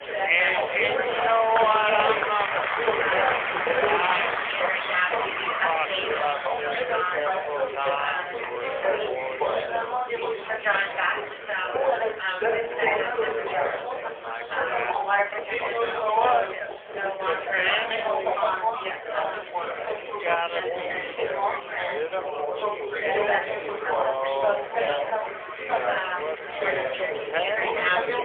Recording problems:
phone-call audio; poor line; nothing above 3 kHz
thin; very; fading below 450 Hz
wrong speed, natural pitch; too slow; 0.5 times normal speed
chatter from many people; very loud; throughout; 2 dB above the speech

